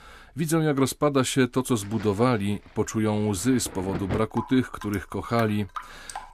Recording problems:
rain or running water; noticeable; throughout; 15 dB below the speech

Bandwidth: 14.5 kHz